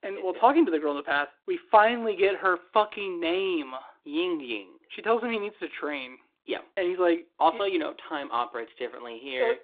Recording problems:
phone-call audio

